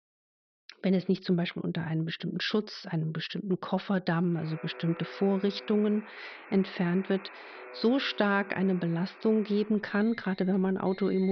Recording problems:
high frequencies cut off; noticeable; nothing above 5.5 kHz
alarms or sirens; noticeable; from 4.5 s on; 20 dB below the speech
abrupt cut into speech; at the end

